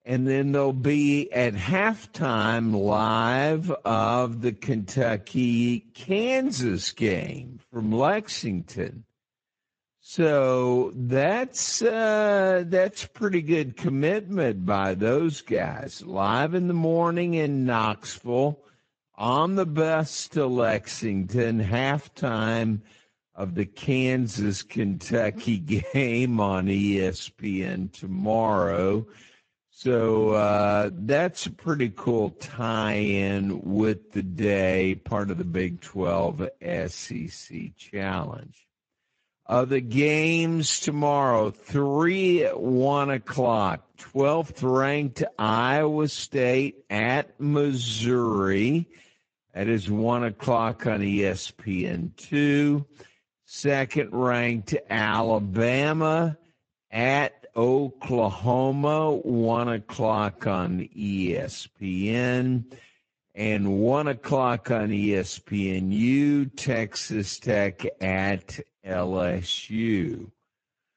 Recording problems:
wrong speed, natural pitch; too slow; 0.6 times normal speed
garbled, watery; slightly; nothing above 7.5 kHz

